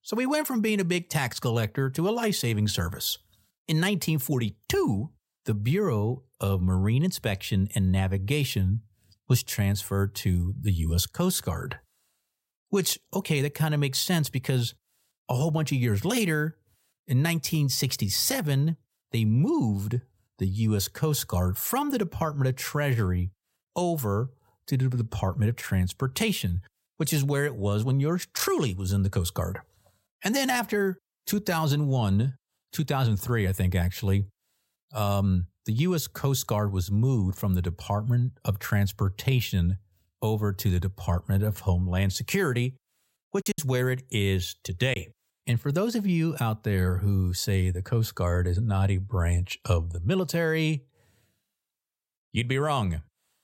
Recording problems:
choppy; occasionally; from 43 to 45 s; 3% of the speech affected

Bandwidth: 16 kHz